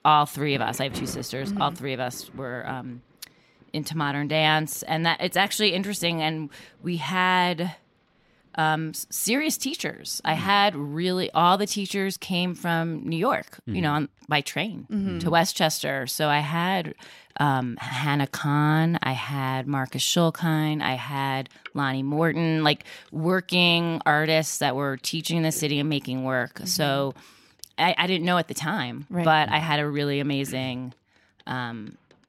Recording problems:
rain or running water; faint; throughout; 25 dB below the speech

